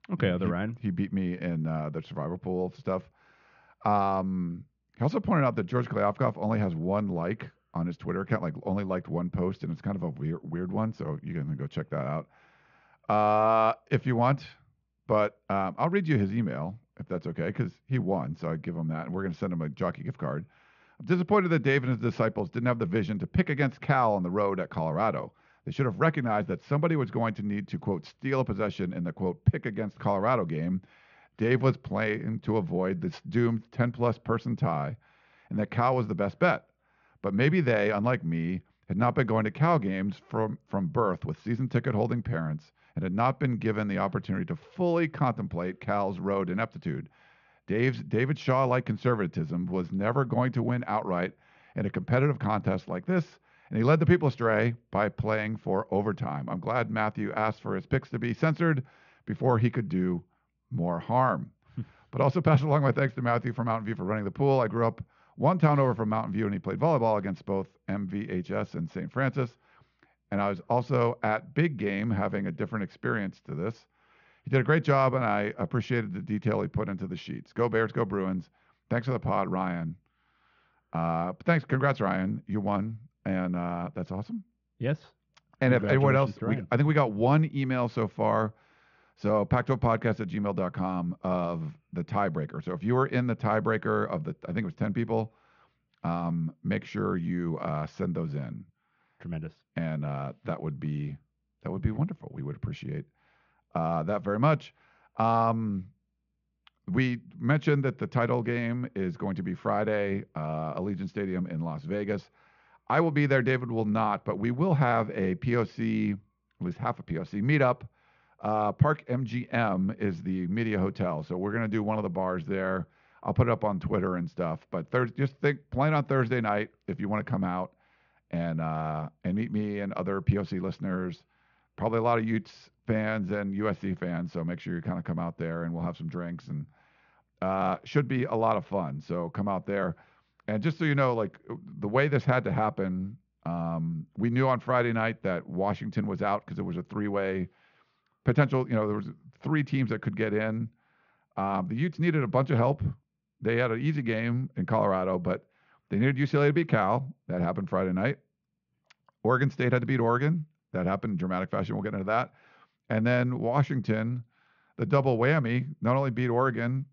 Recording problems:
muffled; very slightly; fading above 3 kHz
high frequencies cut off; slight; nothing above 7 kHz

